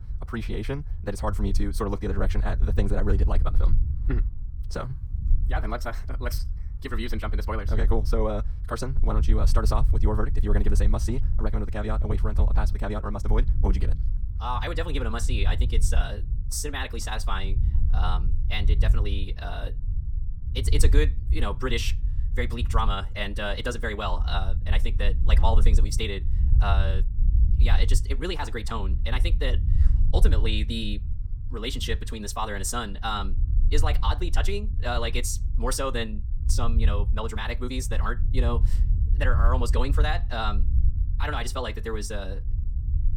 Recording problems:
wrong speed, natural pitch; too fast; 1.7 times normal speed
low rumble; noticeable; throughout; 15 dB below the speech

